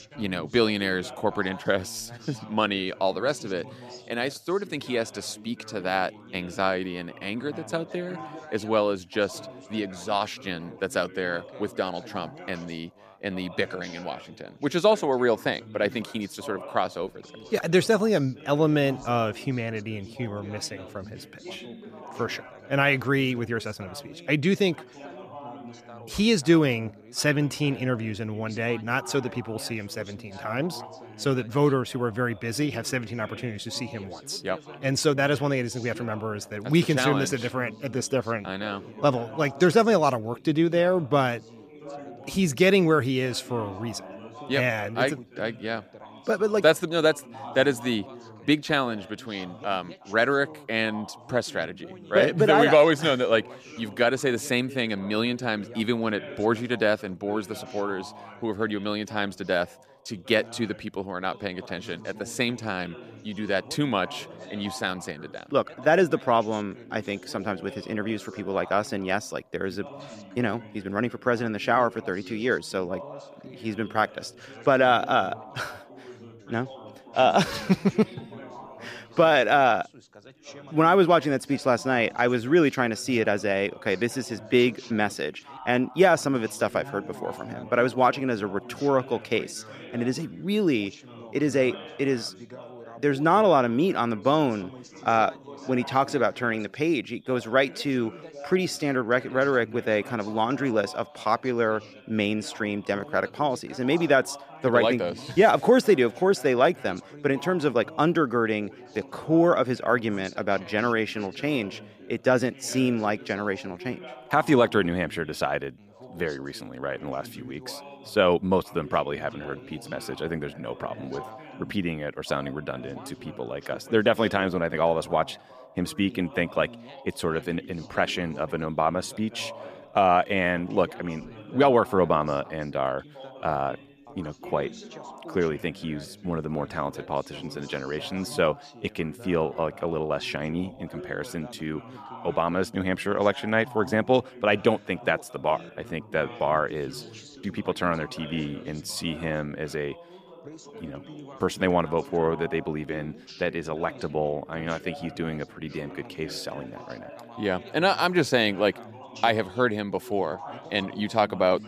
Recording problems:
background chatter; noticeable; throughout; 3 voices, 20 dB below the speech

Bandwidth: 14.5 kHz